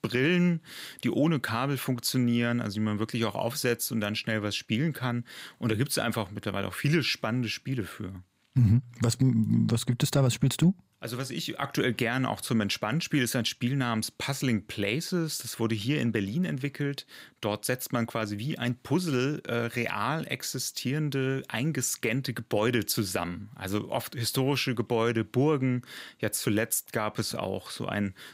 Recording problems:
none

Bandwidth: 15.5 kHz